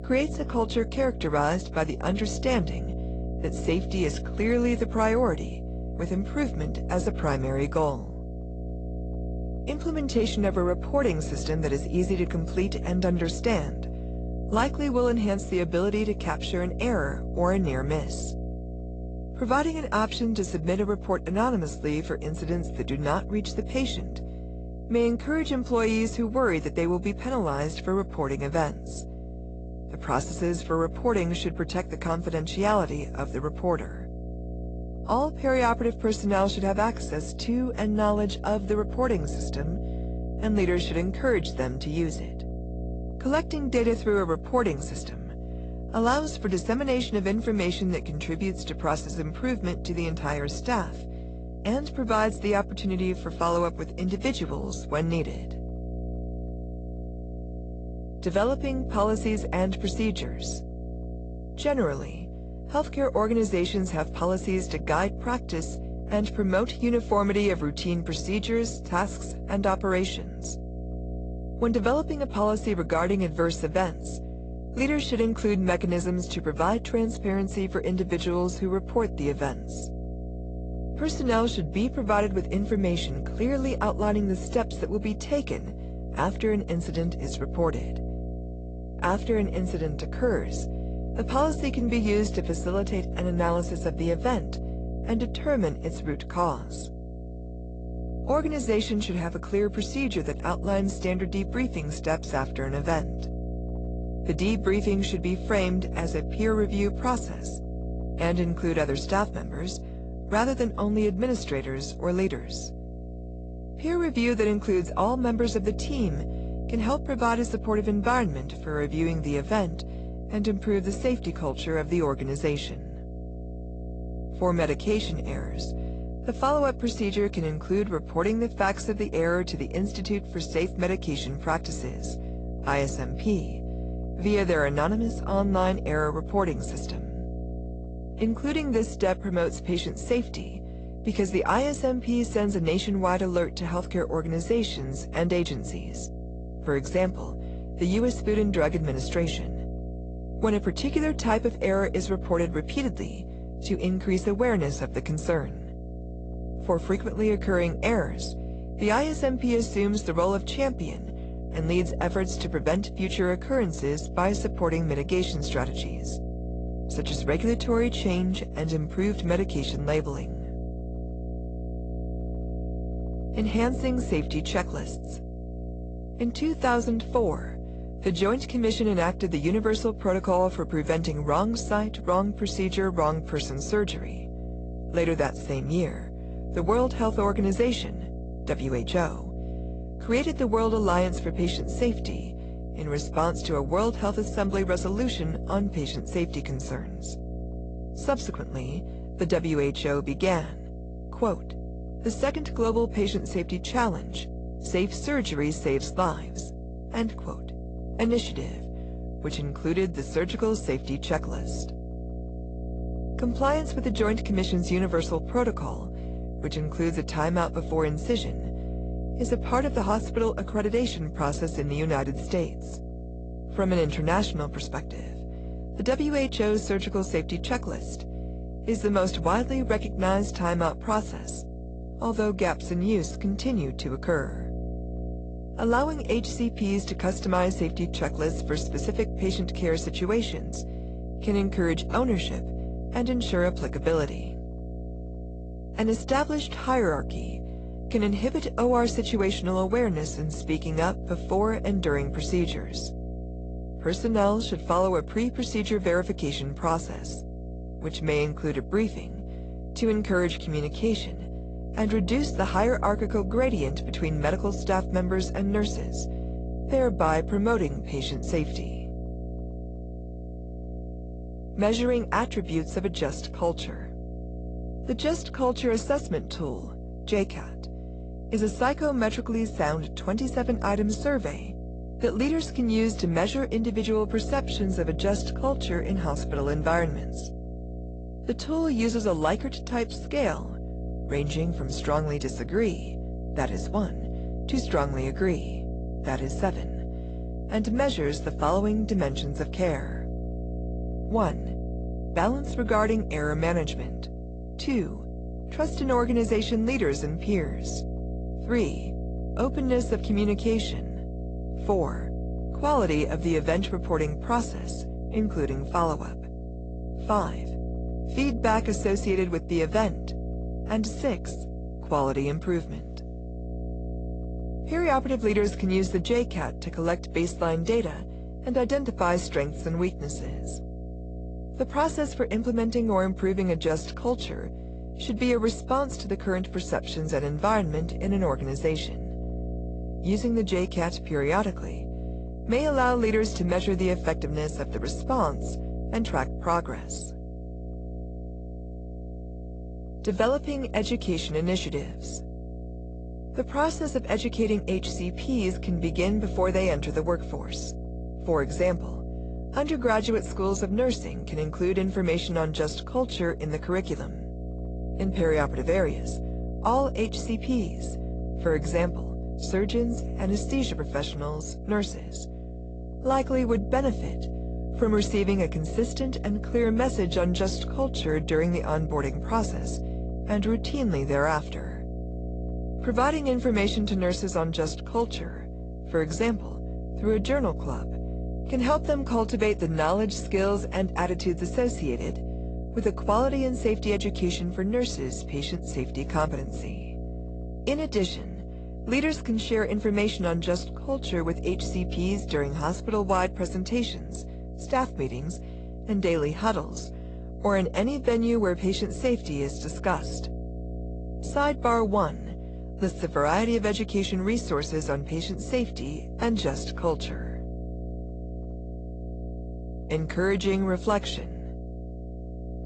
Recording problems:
garbled, watery; slightly; nothing above 8 kHz
electrical hum; noticeable; throughout; 60 Hz, 15 dB below the speech

